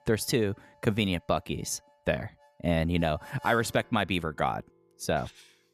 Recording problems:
background music; faint; throughout; 25 dB below the speech

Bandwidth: 14.5 kHz